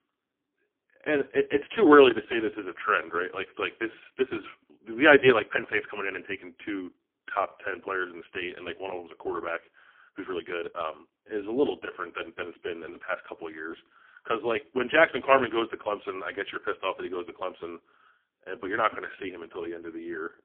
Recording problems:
phone-call audio; poor line; nothing above 3.5 kHz
uneven, jittery; strongly; from 4 to 19 s

